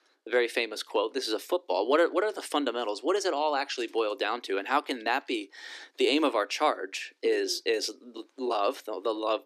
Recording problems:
thin; somewhat; fading below 300 Hz

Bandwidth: 14.5 kHz